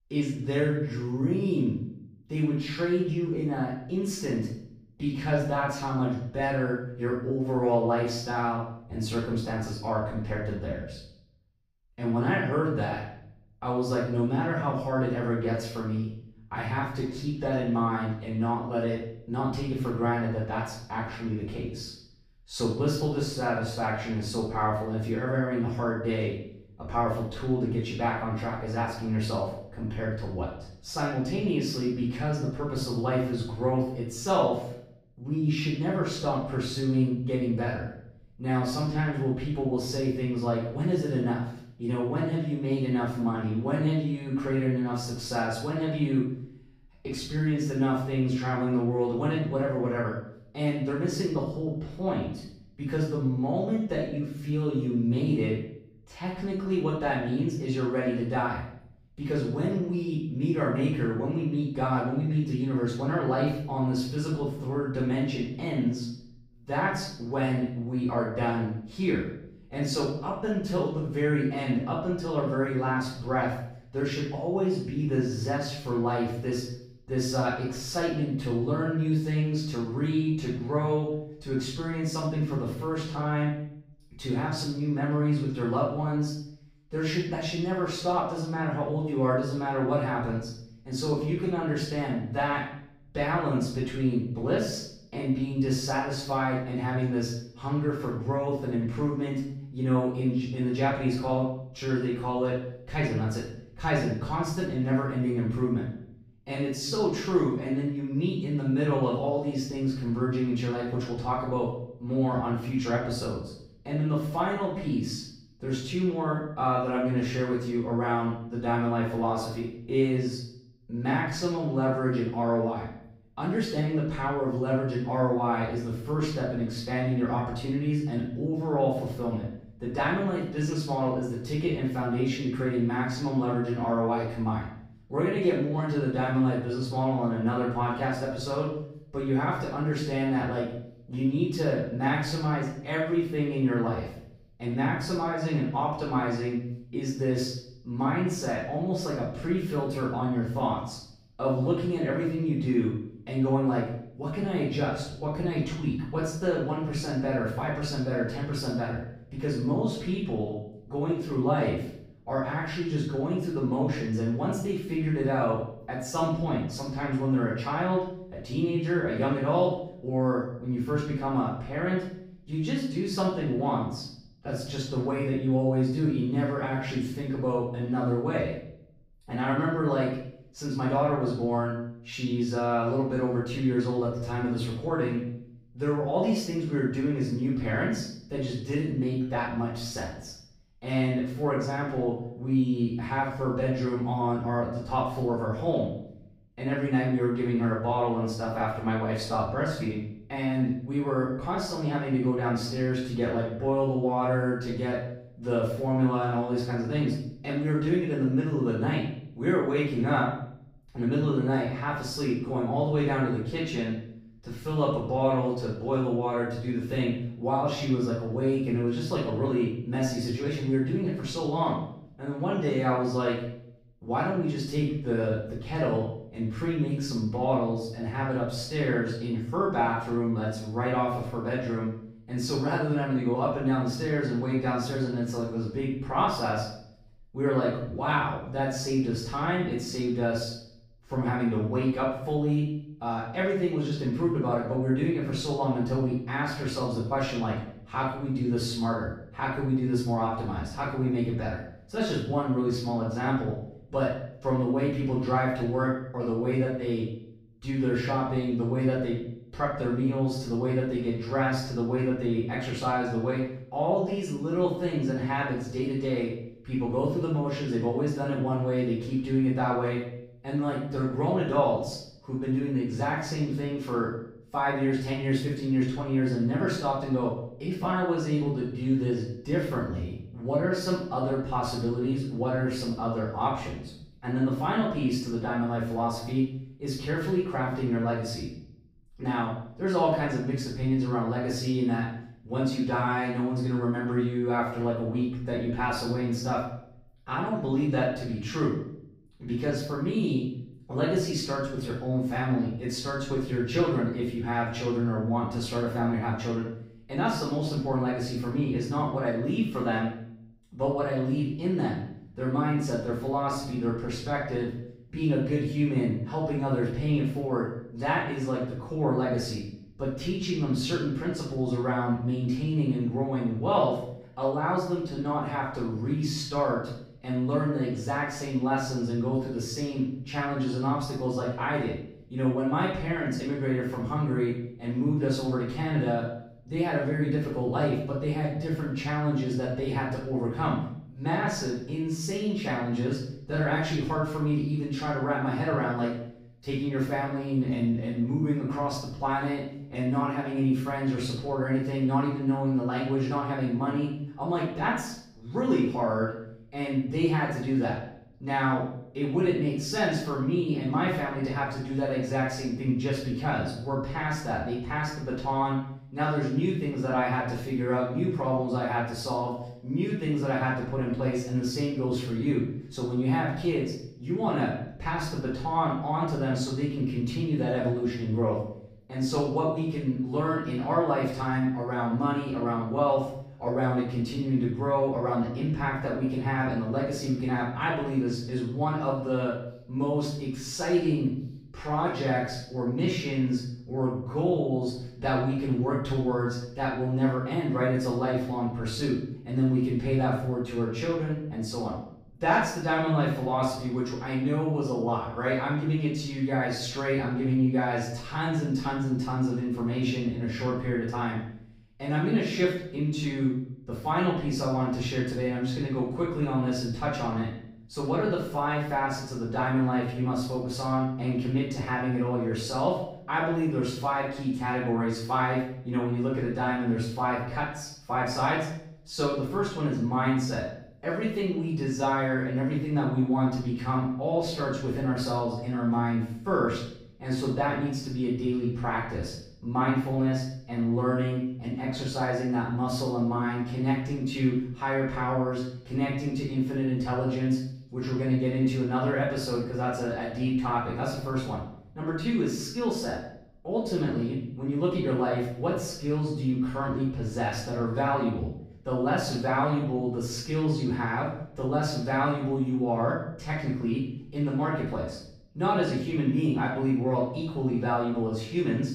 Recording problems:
off-mic speech; far
room echo; noticeable; dies away in 0.6 s

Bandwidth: 15.5 kHz